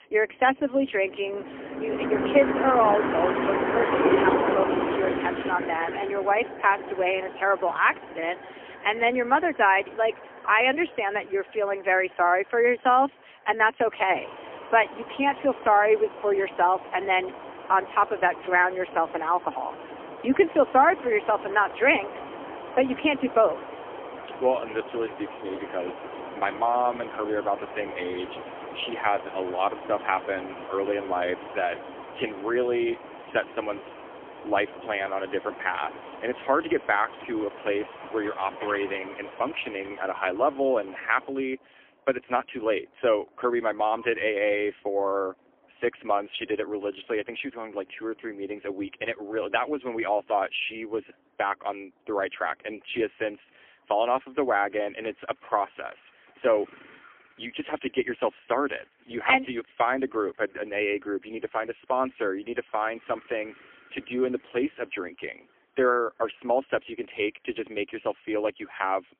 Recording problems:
phone-call audio; poor line; nothing above 3.5 kHz
traffic noise; loud; throughout; 7 dB below the speech

